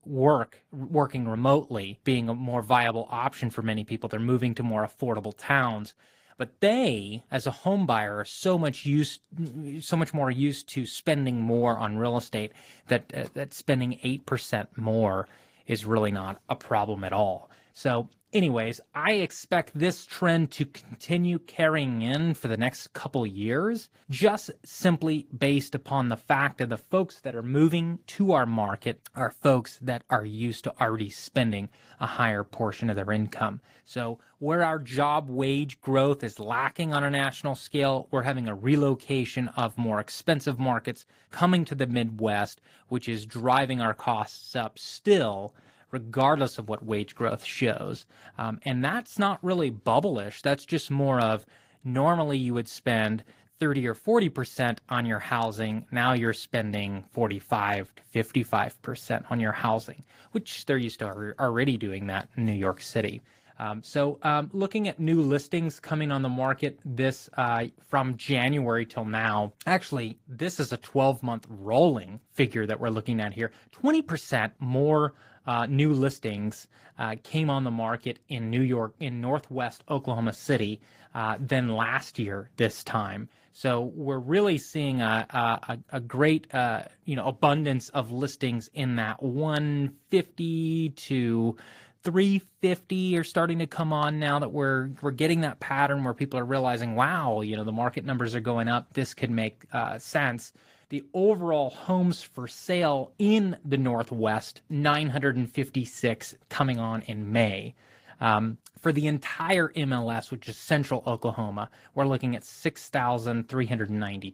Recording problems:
garbled, watery; slightly; nothing above 15.5 kHz

